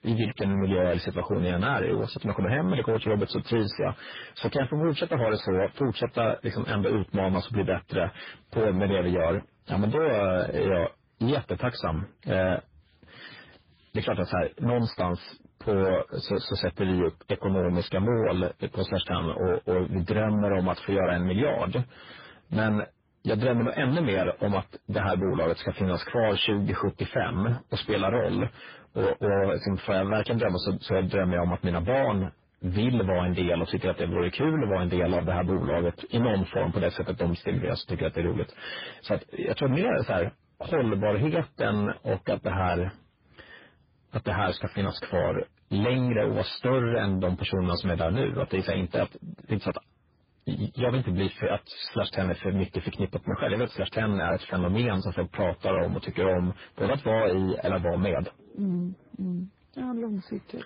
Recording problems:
distortion; heavy; 7 dB below the speech
garbled, watery; badly; nothing above 5 kHz

